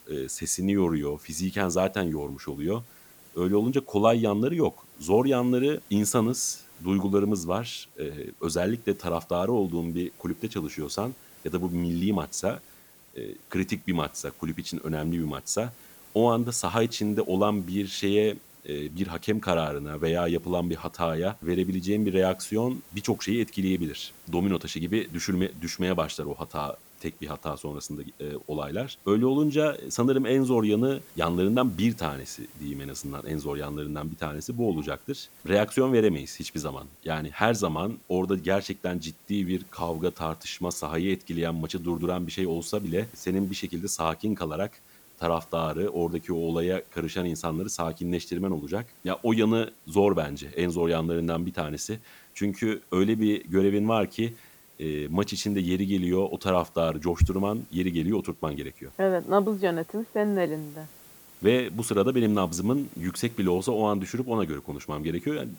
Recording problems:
hiss; faint; throughout; 20 dB below the speech

